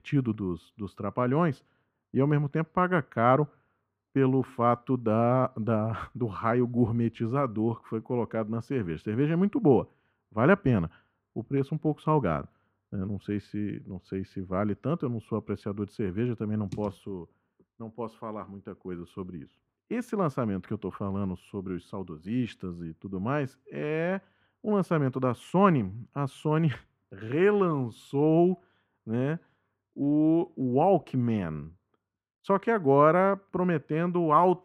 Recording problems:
muffled; very; fading above 3.5 kHz

